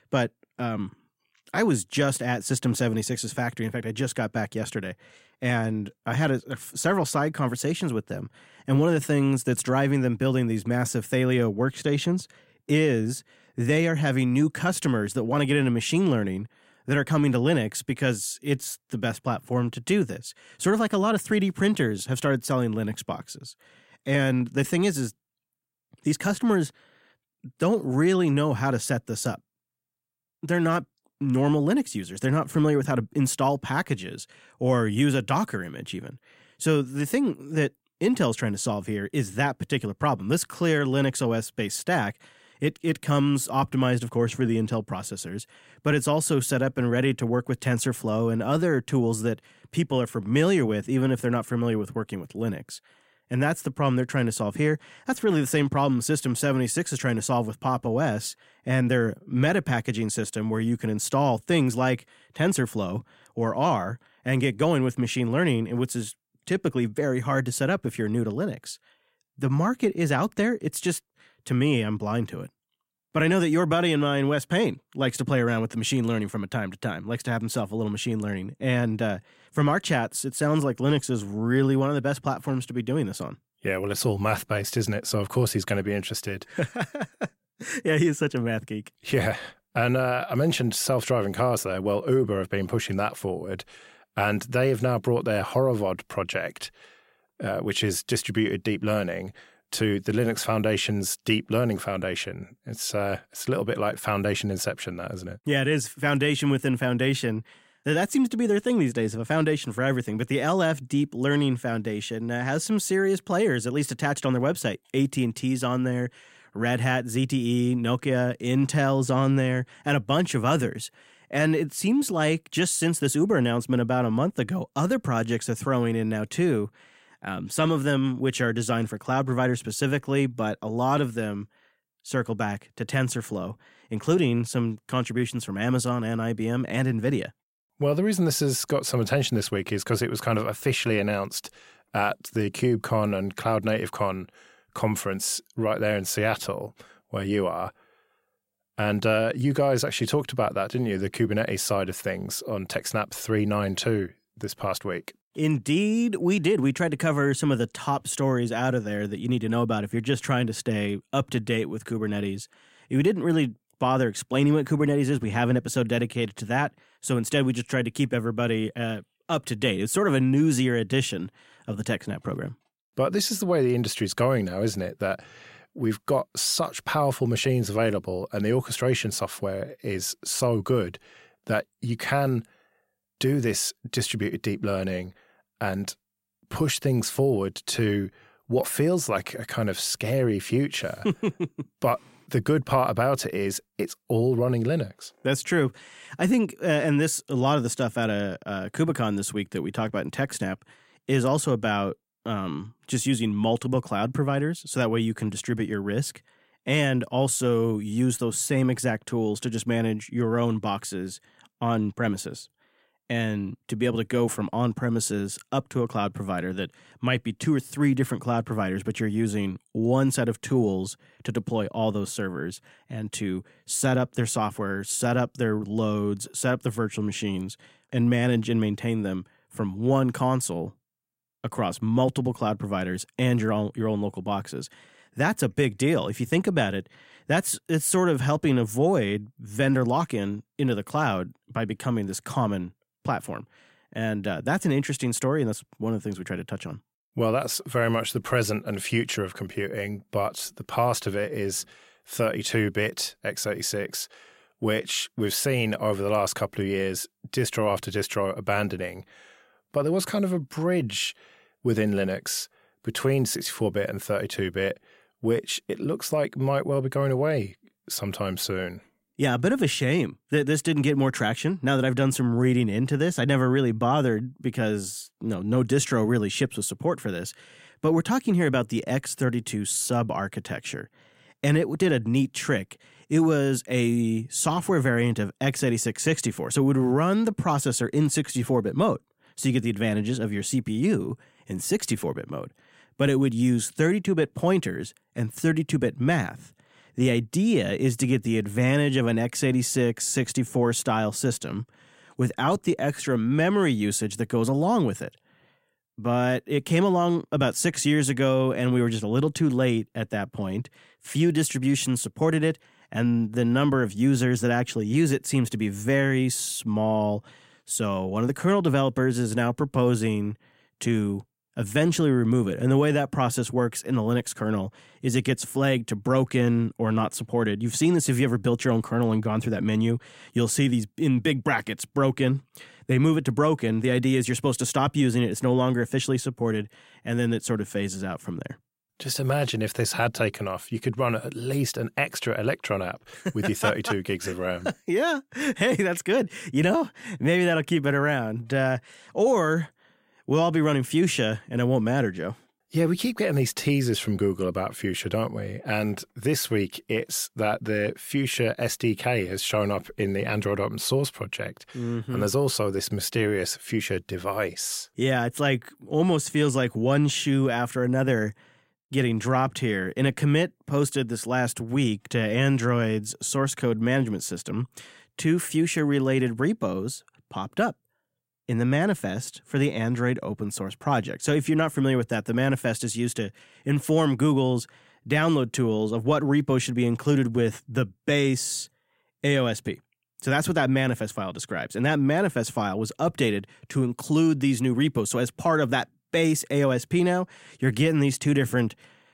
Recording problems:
none

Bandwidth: 16 kHz